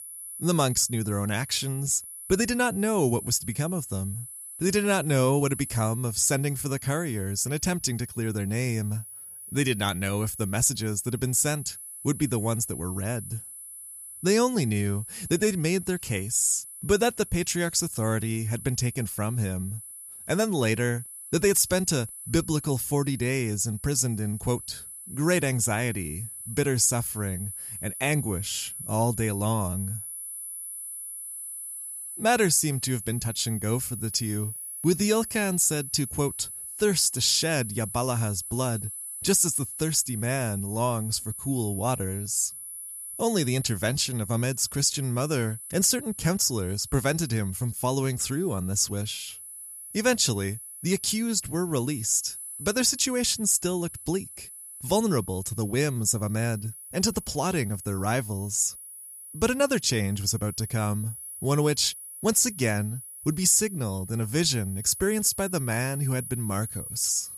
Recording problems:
high-pitched whine; noticeable; throughout; 10 kHz, 10 dB below the speech

